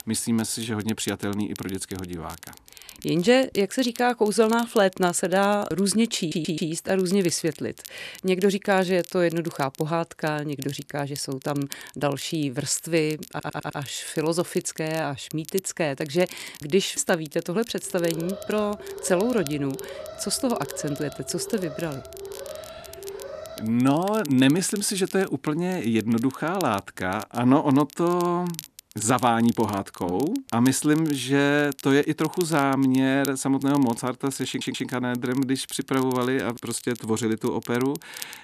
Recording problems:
crackle, like an old record; noticeable; 20 dB below the speech
audio stuttering; at 6 s, at 13 s and at 34 s
alarm; faint; from 18 to 24 s; peak 10 dB below the speech

